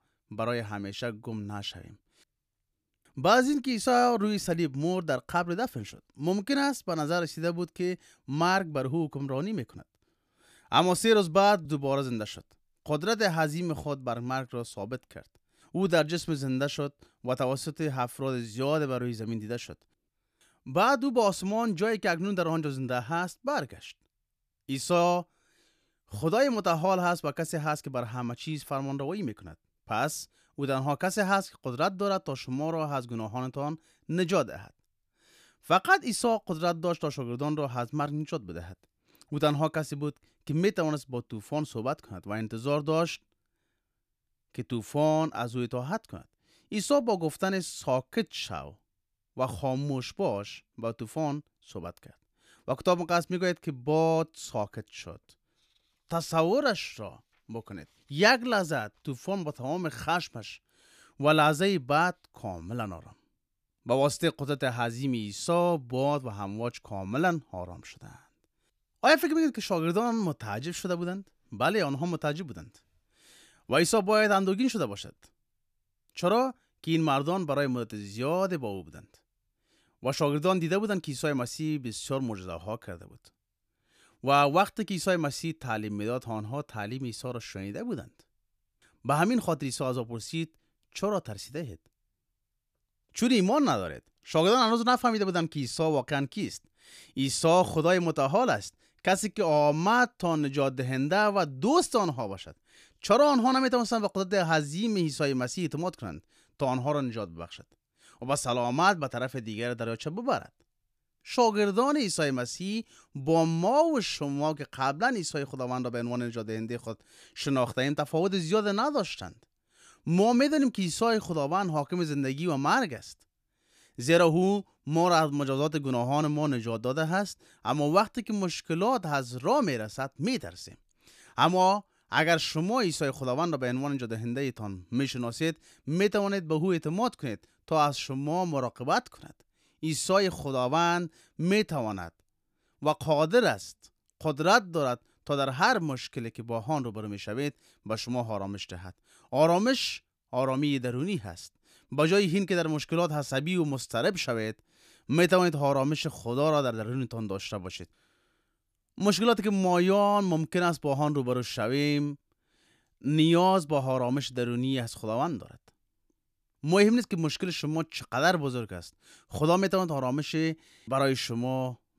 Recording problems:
none

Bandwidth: 14.5 kHz